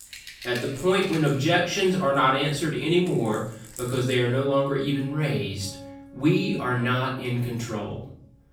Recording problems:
off-mic speech; far
room echo; noticeable; dies away in 0.5 s
background music; noticeable; throughout; 20 dB below the speech

